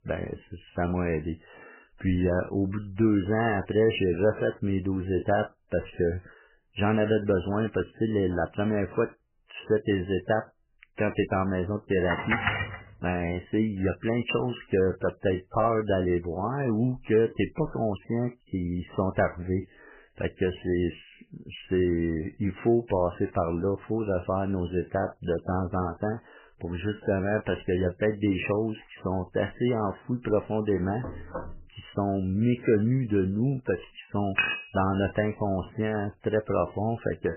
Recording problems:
garbled, watery; badly; nothing above 3 kHz
clattering dishes; loud; at 12 s and at 34 s; peak 2 dB above the speech
door banging; faint; at 31 s; peak 10 dB below the speech

